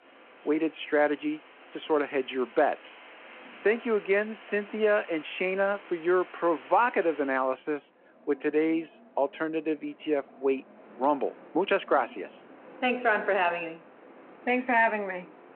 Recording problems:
phone-call audio
wind in the background; faint; throughout; 20 dB below the speech

